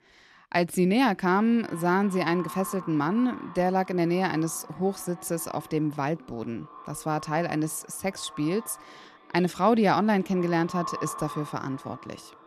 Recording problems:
echo of what is said; noticeable; throughout; 350 ms later, 15 dB below the speech

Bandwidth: 13.5 kHz